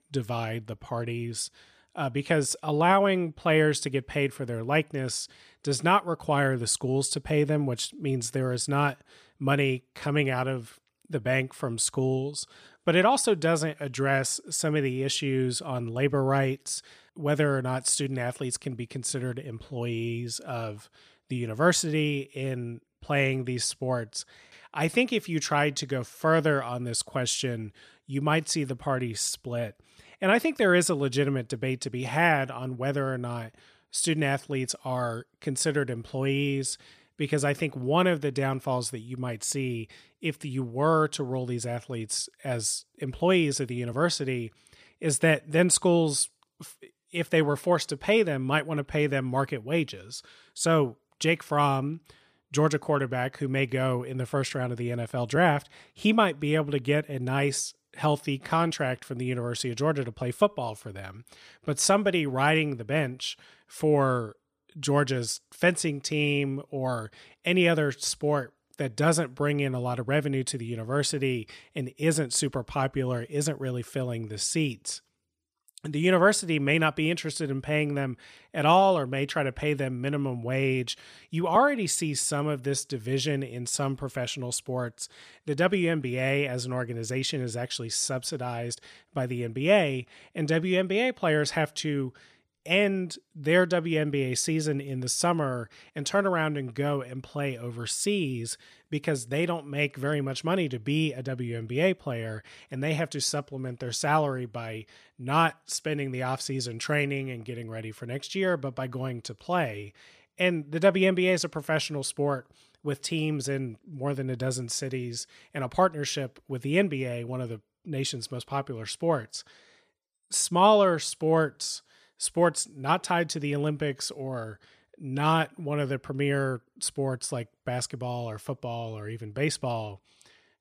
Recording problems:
none

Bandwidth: 15 kHz